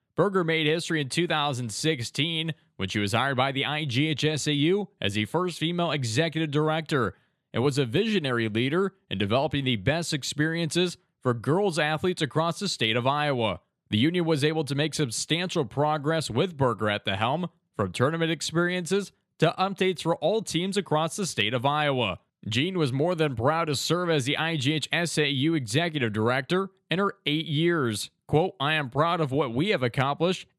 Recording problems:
none

